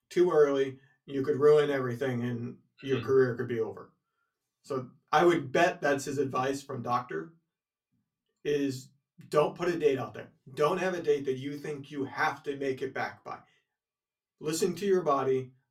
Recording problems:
room echo; very slight; dies away in 0.2 s
off-mic speech; somewhat distant

